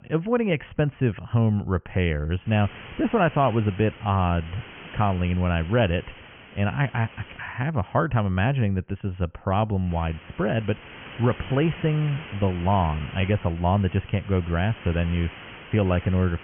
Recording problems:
high frequencies cut off; severe; nothing above 3 kHz
hiss; noticeable; from 2.5 to 7.5 s and from 10 s on; 15 dB below the speech

